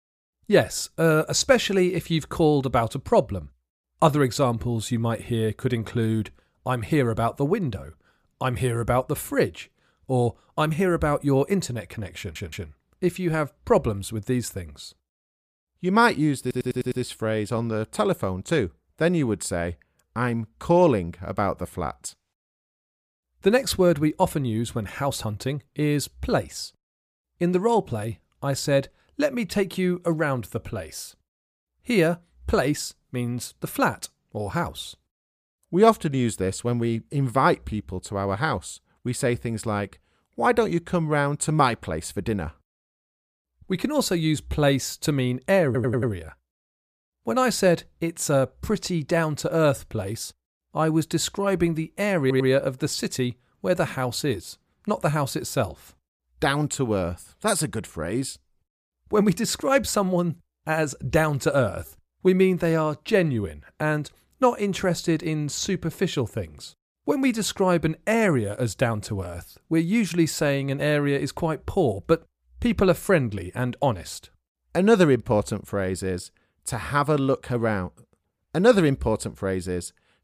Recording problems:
audio stuttering; 4 times, first at 12 s

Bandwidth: 15 kHz